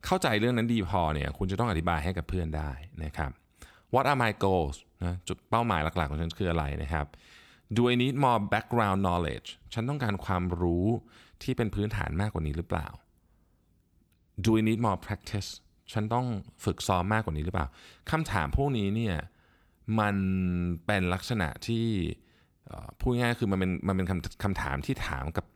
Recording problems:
none

